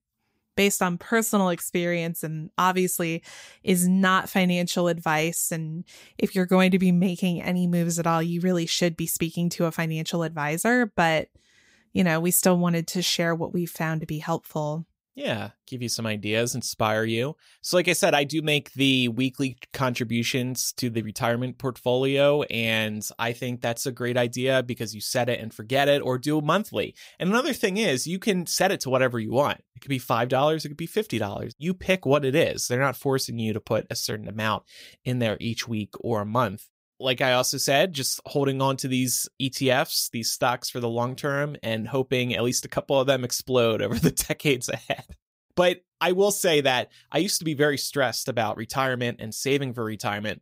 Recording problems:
none

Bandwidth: 15.5 kHz